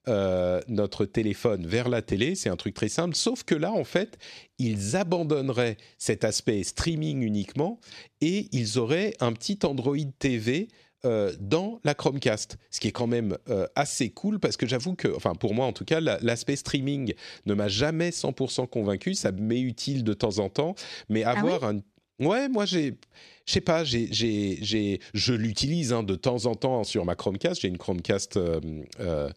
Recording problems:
none

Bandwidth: 13.5 kHz